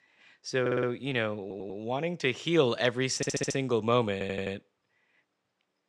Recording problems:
audio stuttering; 4 times, first at 0.5 s

